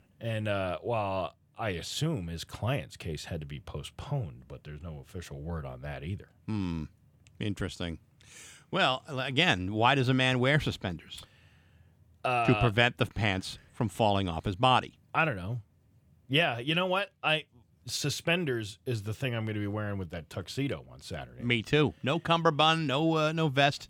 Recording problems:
none

